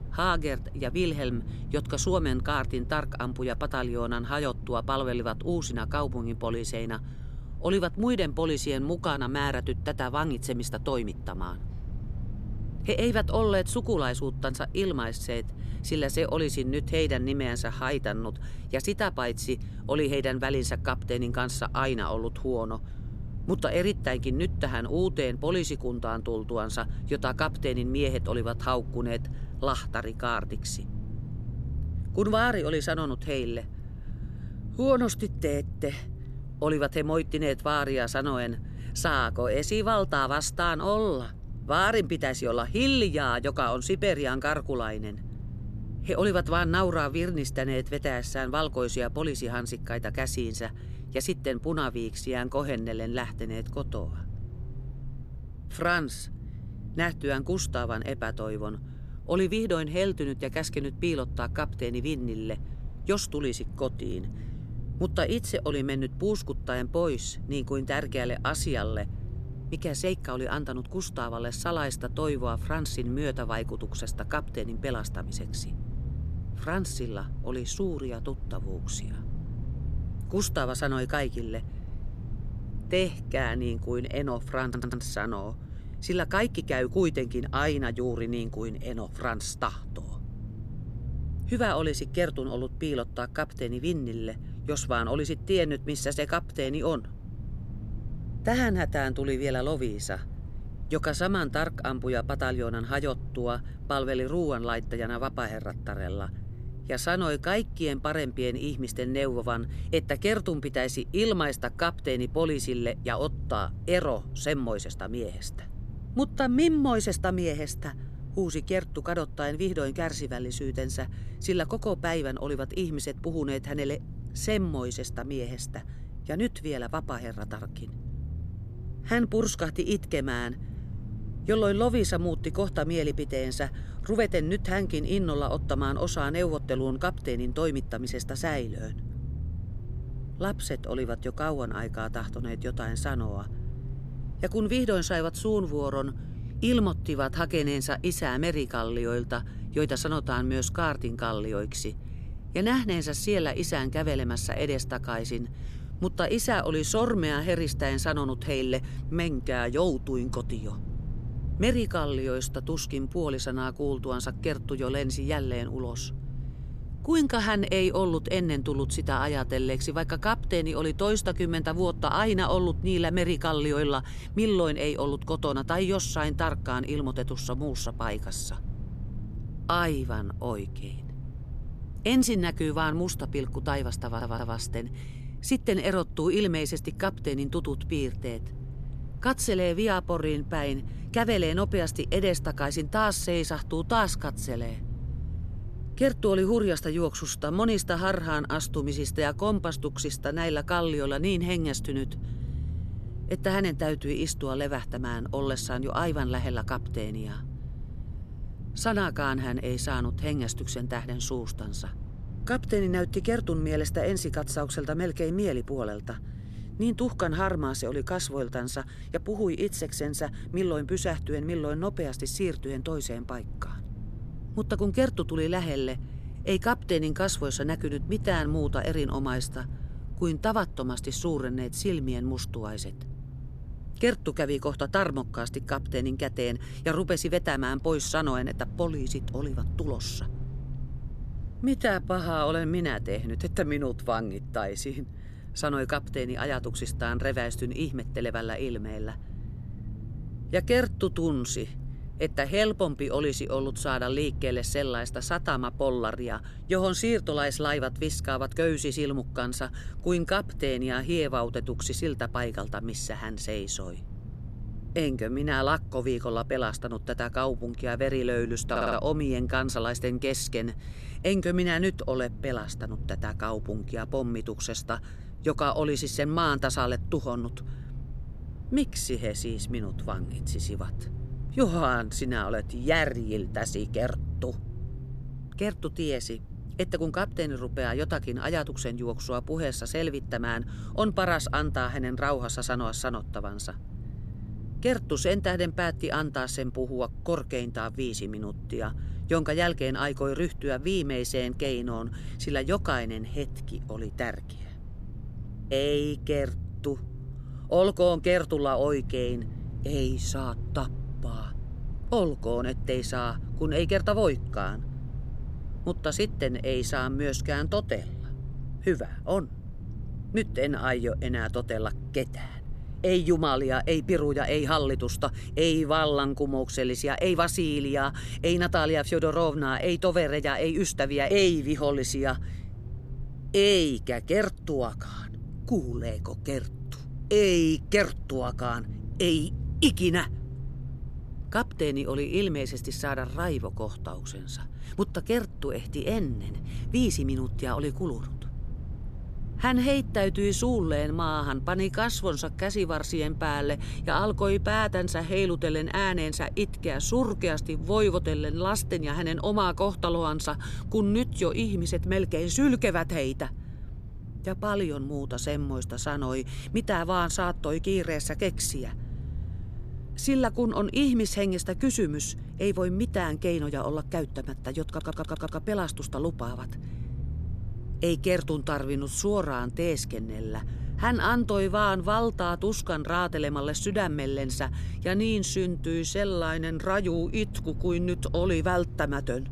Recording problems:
low rumble; faint; throughout; 20 dB below the speech
audio stuttering; 4 times, first at 1:25

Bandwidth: 13.5 kHz